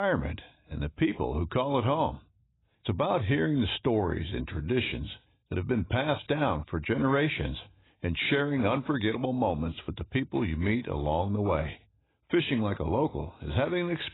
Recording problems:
garbled, watery; badly; nothing above 4 kHz
abrupt cut into speech; at the start

